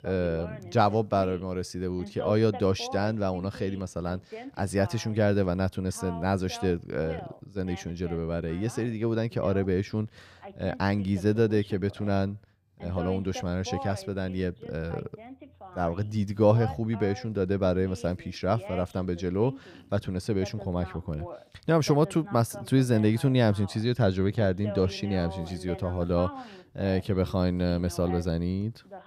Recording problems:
voice in the background; noticeable; throughout; 15 dB below the speech

